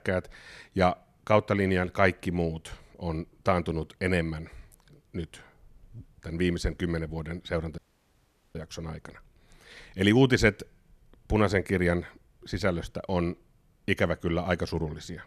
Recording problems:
audio cutting out; at 8 s for 1 s

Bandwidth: 14.5 kHz